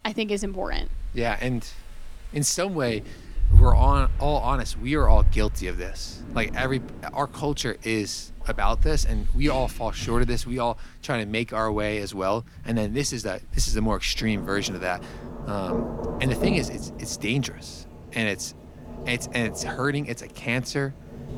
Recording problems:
rain or running water; loud; throughout; 2 dB below the speech

